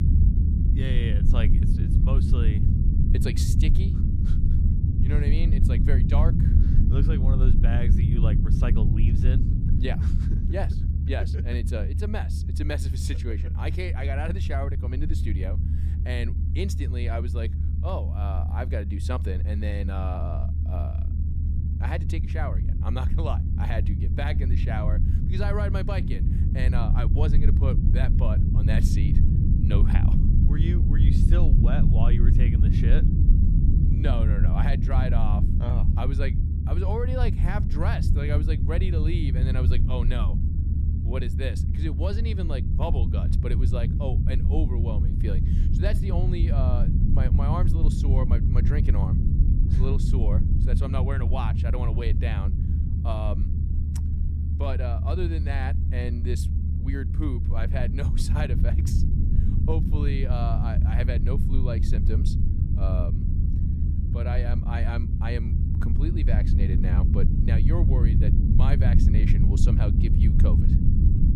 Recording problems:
low rumble; loud; throughout; 2 dB below the speech

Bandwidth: 14.5 kHz